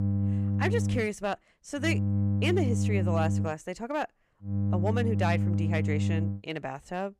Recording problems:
electrical hum; loud; until 1 s, from 2 to 3.5 s and from 4.5 to 6.5 s; 50 Hz, 6 dB below the speech

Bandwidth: 14.5 kHz